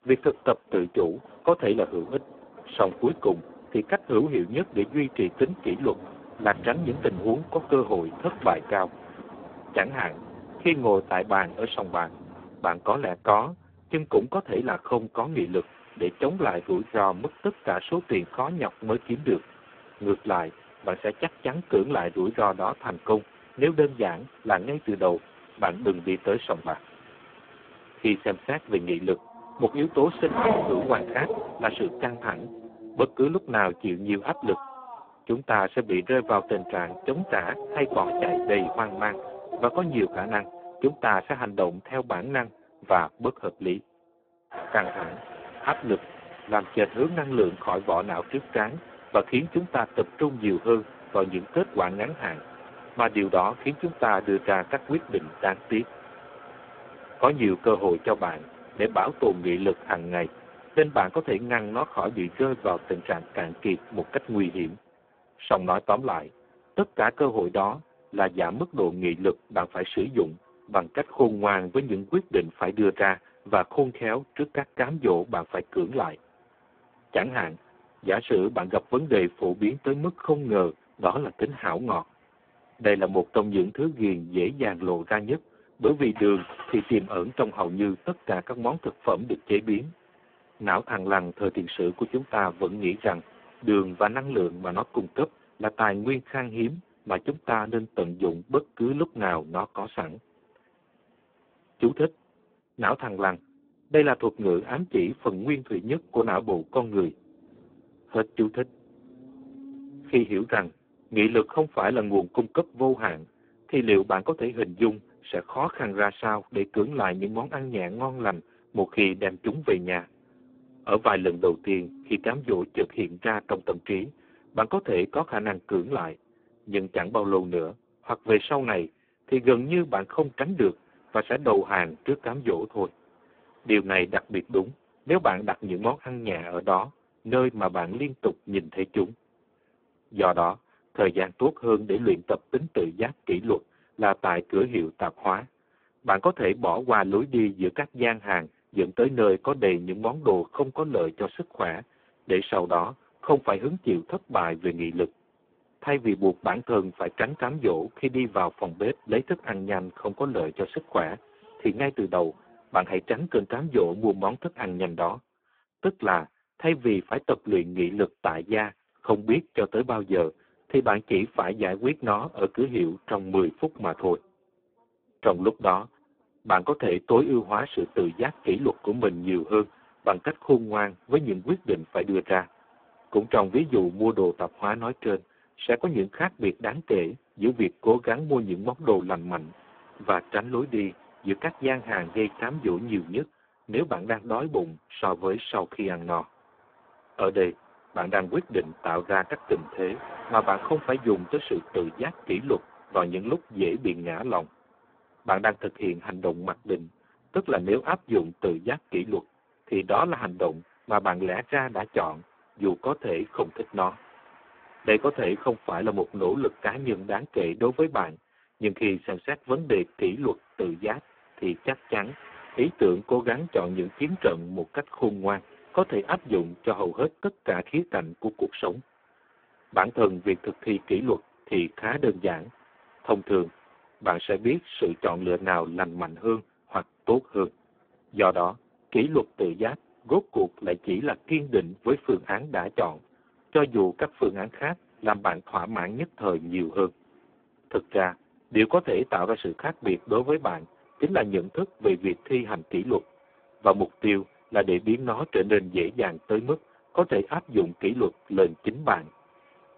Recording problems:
phone-call audio; poor line
traffic noise; noticeable; throughout; 15 dB below the speech

